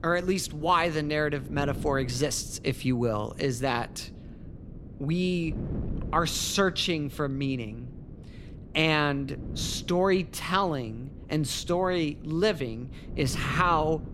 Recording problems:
wind noise on the microphone; occasional gusts; 20 dB below the speech

